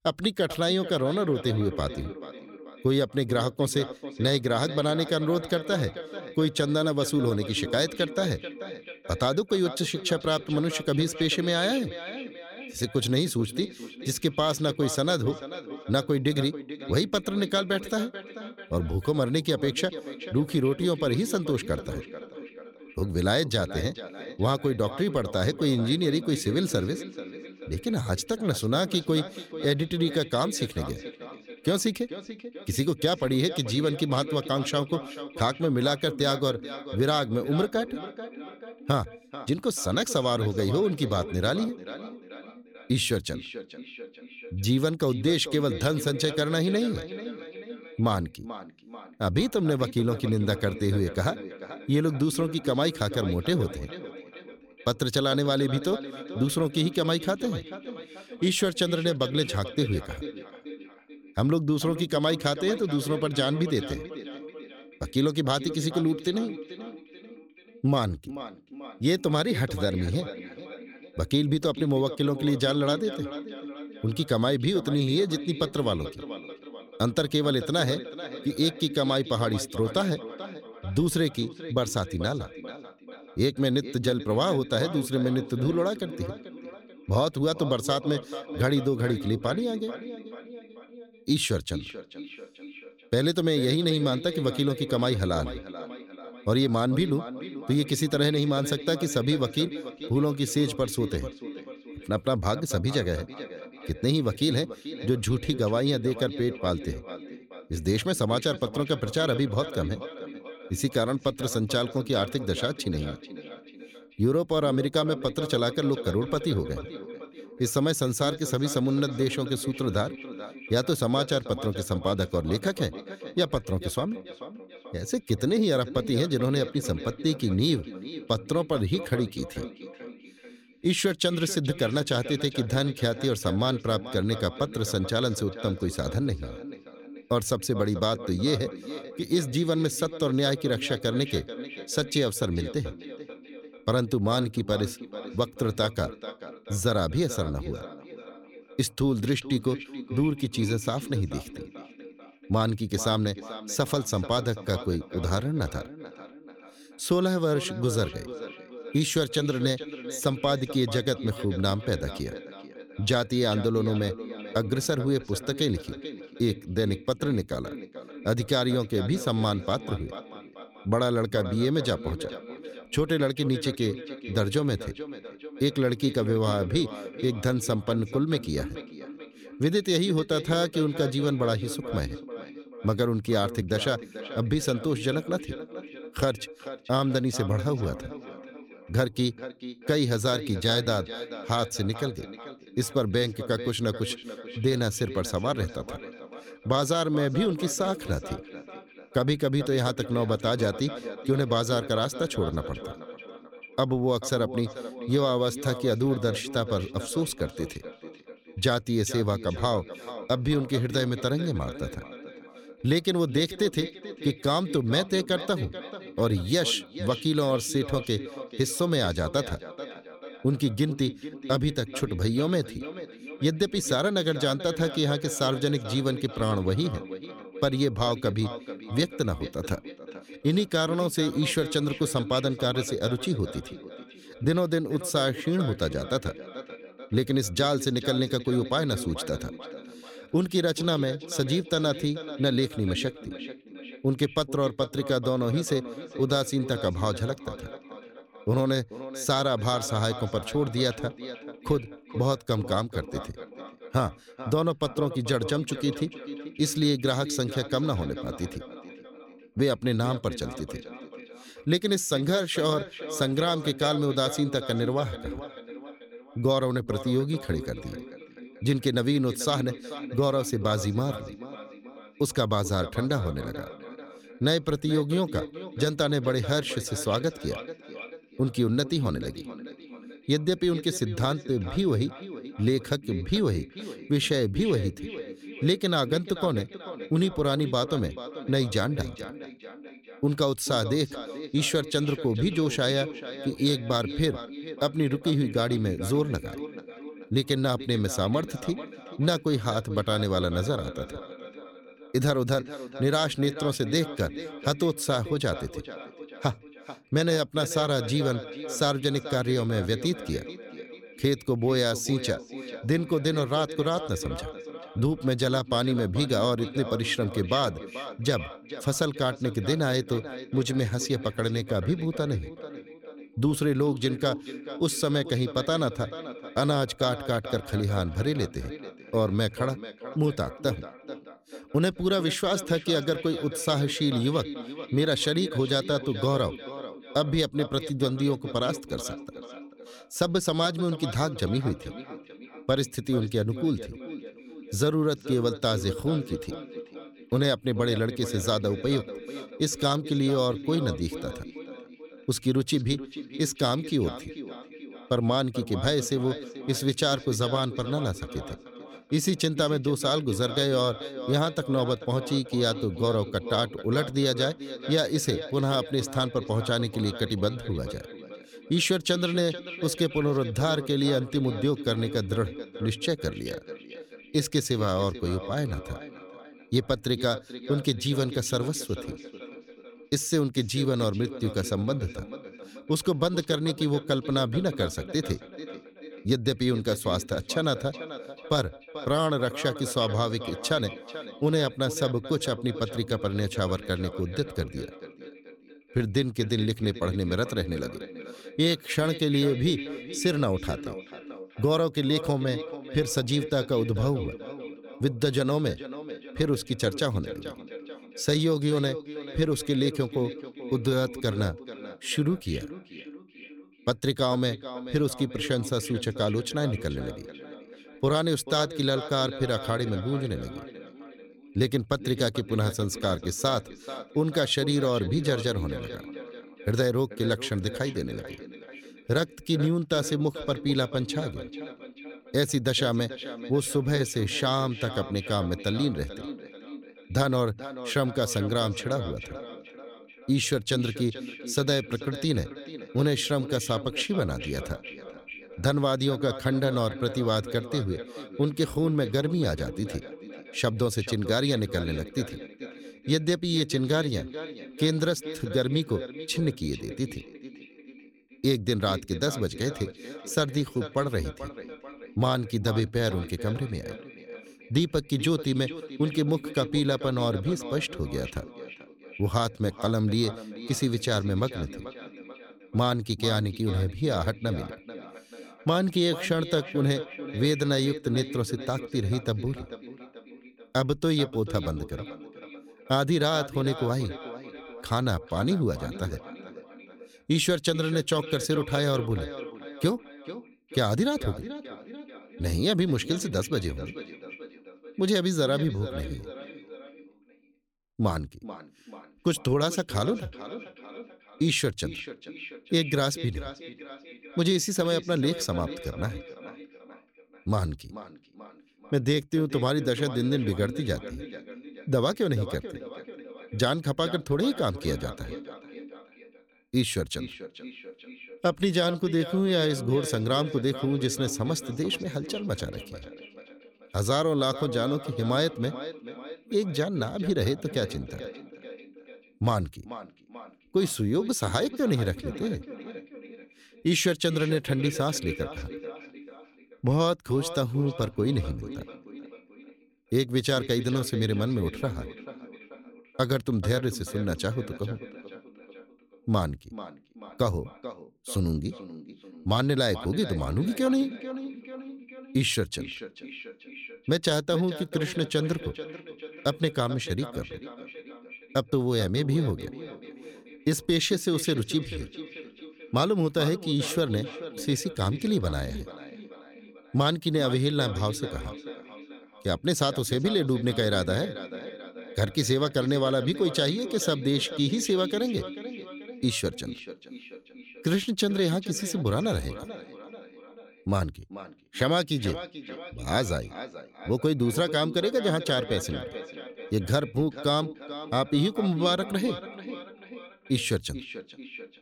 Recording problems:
echo of what is said; noticeable; throughout; 440 ms later, 15 dB below the speech

